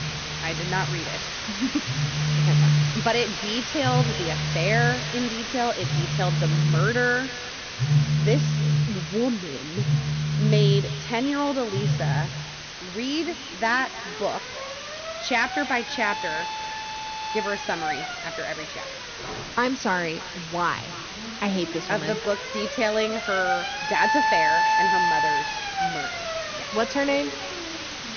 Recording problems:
echo of what is said; noticeable; throughout; 310 ms later, 15 dB below the speech
high frequencies cut off; noticeable; nothing above 6.5 kHz
alarms or sirens; very loud; throughout; 1 dB above the speech
hiss; loud; throughout; 5 dB below the speech

